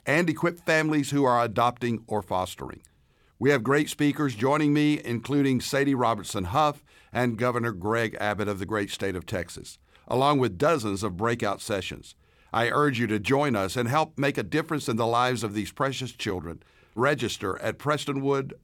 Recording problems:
none

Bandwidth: 18 kHz